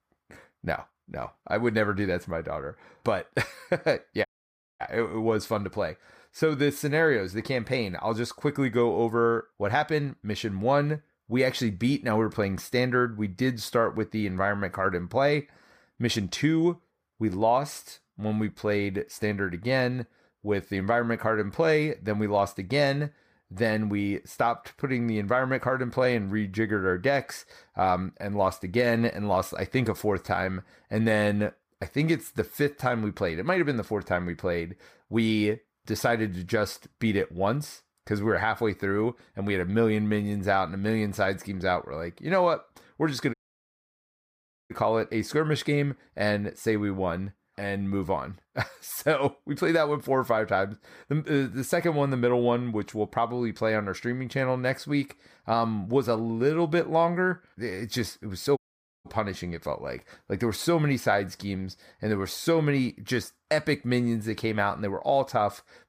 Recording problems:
audio cutting out; at 4.5 s for 0.5 s, at 43 s for 1.5 s and at 59 s

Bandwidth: 15 kHz